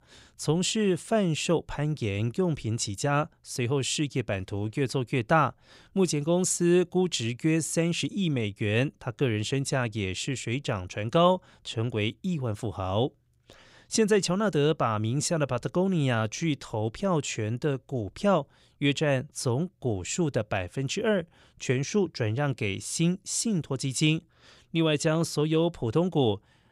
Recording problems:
none

